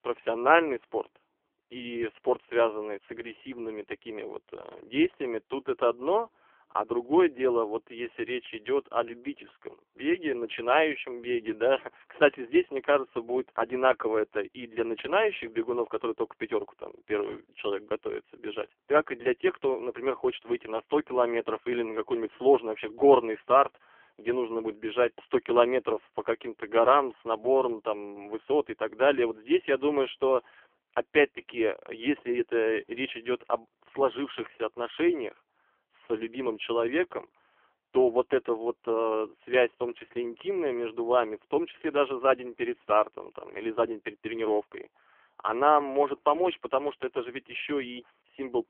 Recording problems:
phone-call audio; poor line; nothing above 3.5 kHz

